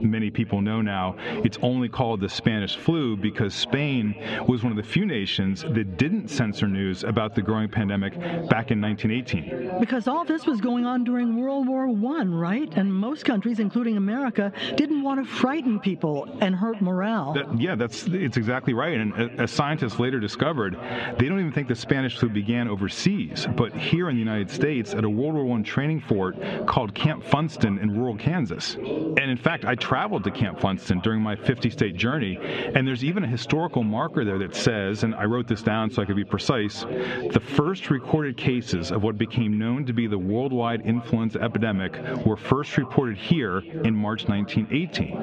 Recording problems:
muffled; slightly; fading above 3.5 kHz
echo of what is said; faint; throughout; 320 ms later, 20 dB below the speech
squashed, flat; somewhat, background pumping
background chatter; noticeable; throughout; 4 voices, 15 dB below the speech

